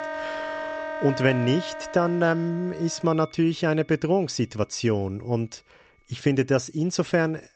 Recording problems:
high frequencies cut off; noticeable; nothing above 8 kHz
background music; loud; throughout; 9 dB below the speech

